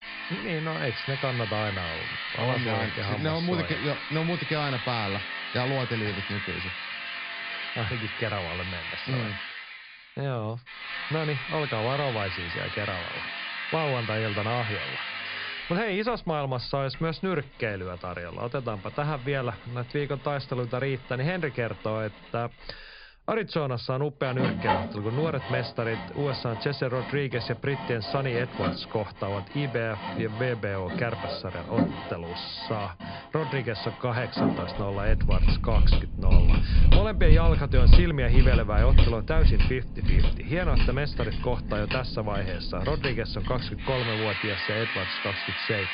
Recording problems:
high frequencies cut off; severe; nothing above 5 kHz
machinery noise; very loud; throughout; 1 dB above the speech

